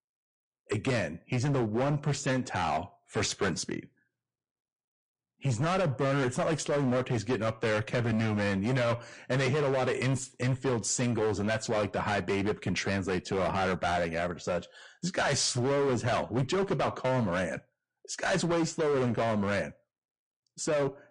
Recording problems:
distortion; heavy; 17% of the sound clipped
garbled, watery; slightly; nothing above 8.5 kHz

